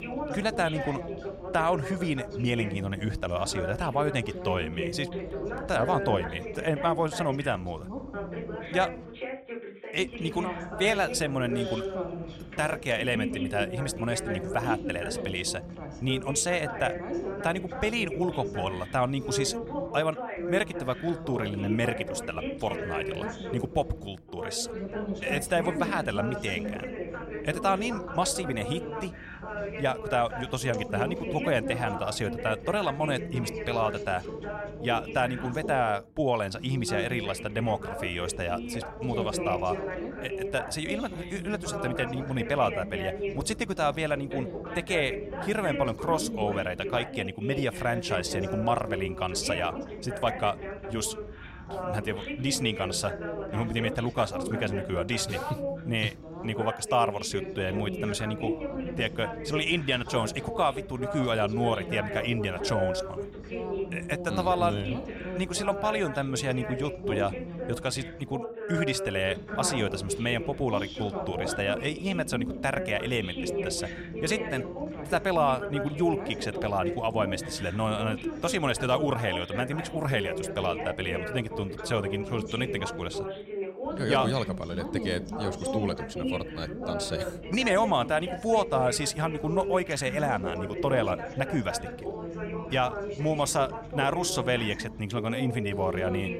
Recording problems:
background chatter; loud; throughout; 2 voices, 5 dB below the speech

